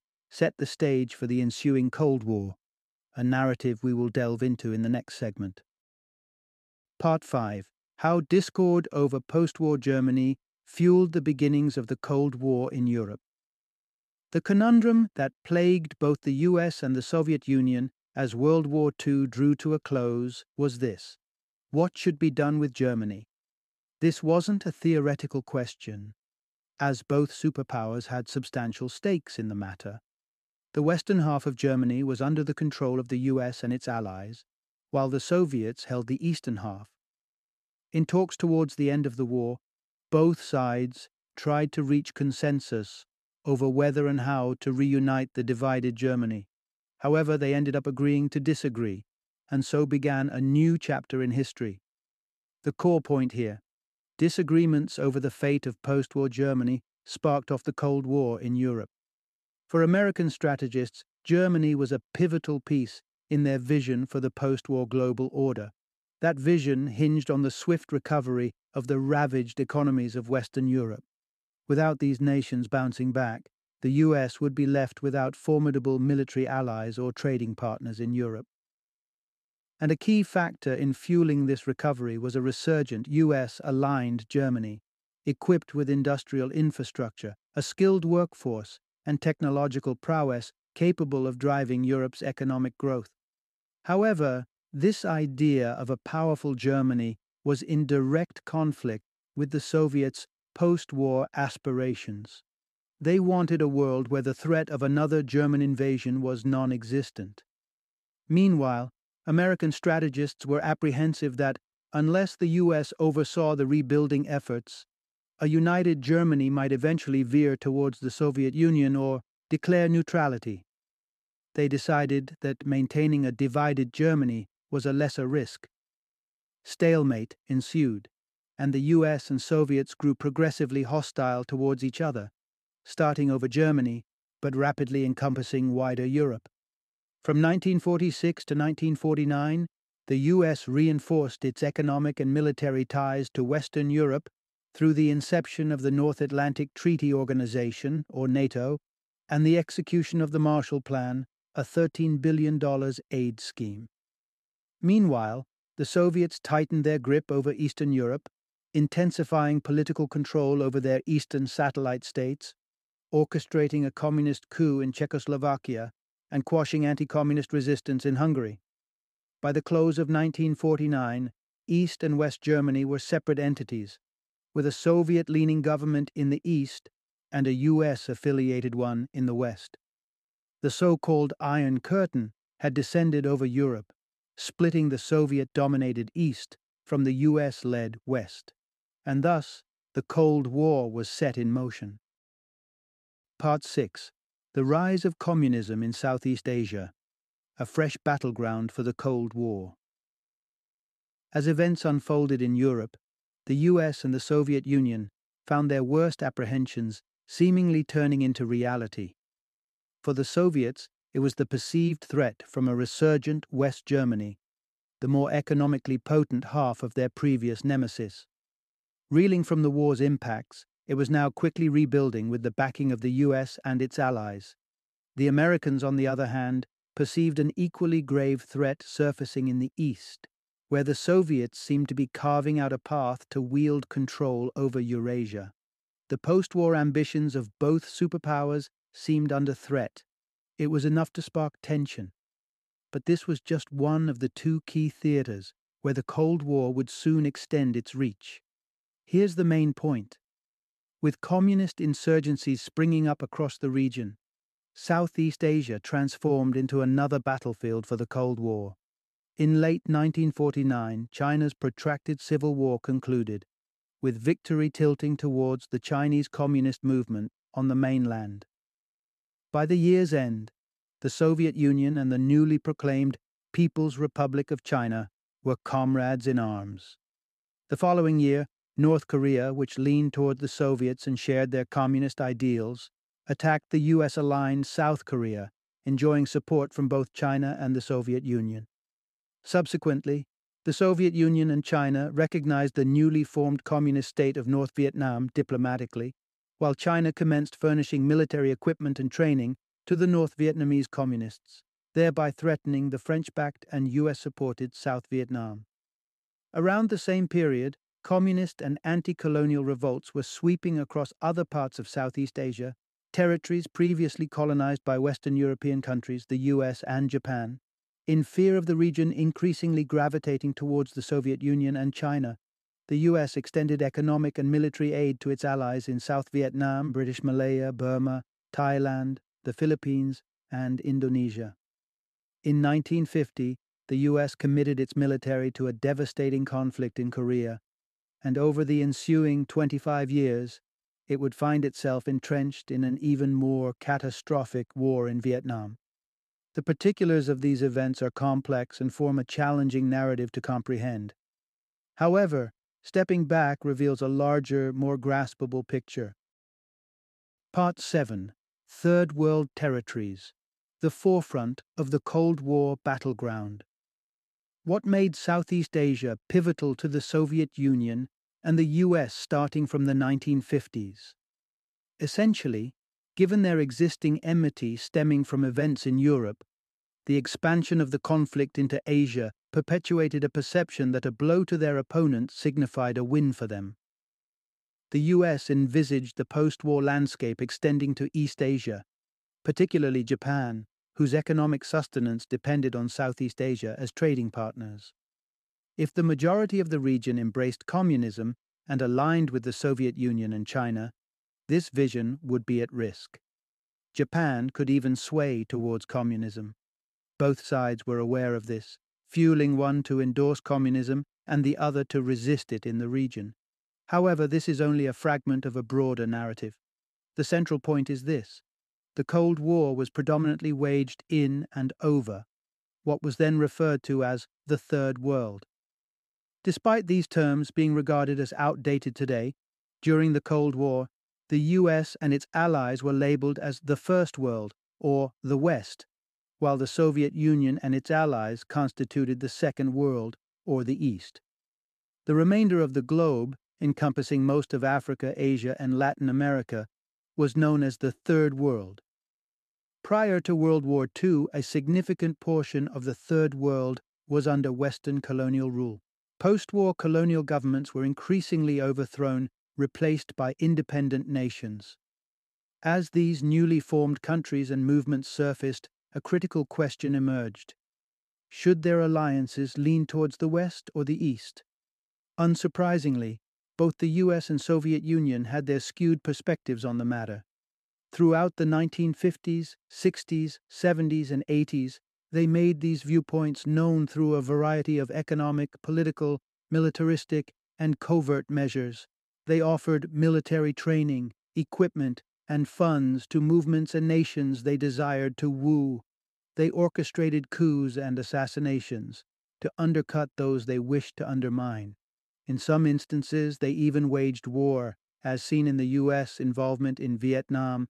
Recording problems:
none

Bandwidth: 13.5 kHz